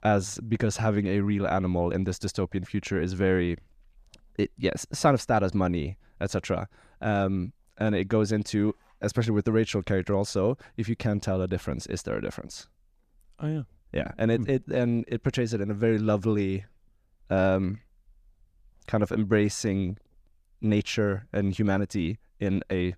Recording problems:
none

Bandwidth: 14.5 kHz